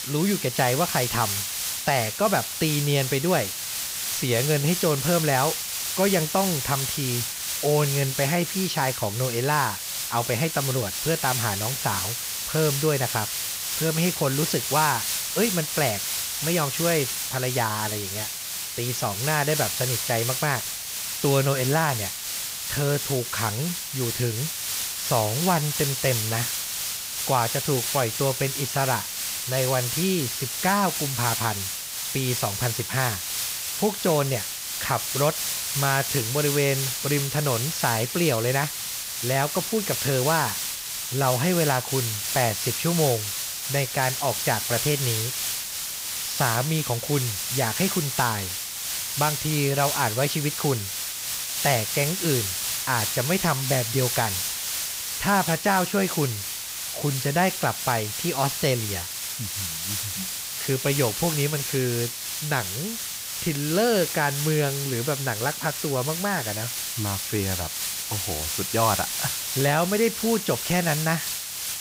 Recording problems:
high frequencies cut off; slight; nothing above 8 kHz
hiss; loud; throughout; 1 dB below the speech

